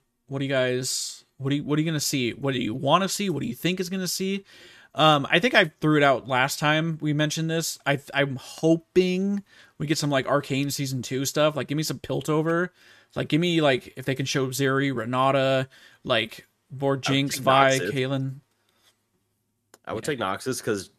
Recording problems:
none

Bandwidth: 14 kHz